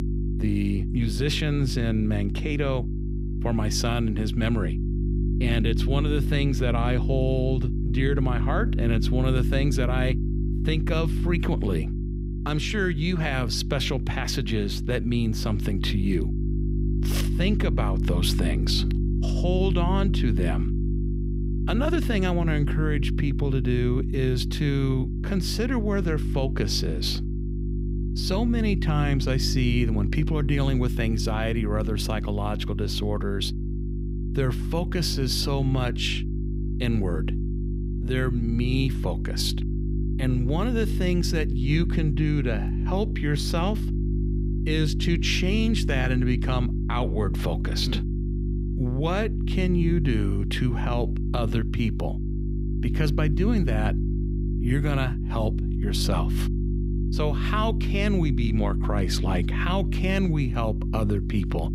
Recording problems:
electrical hum; loud; throughout; 50 Hz, 8 dB below the speech

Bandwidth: 15.5 kHz